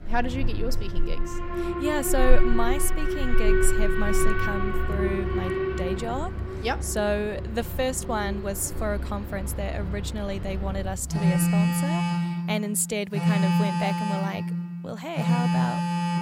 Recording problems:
alarms or sirens; very loud; throughout; 3 dB above the speech

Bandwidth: 16 kHz